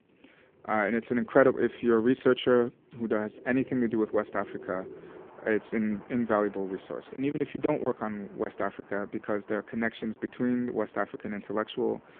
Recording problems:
phone-call audio; poor line
traffic noise; faint; throughout; 20 dB below the speech
choppy; occasionally; from 7 to 10 s; 5% of the speech affected

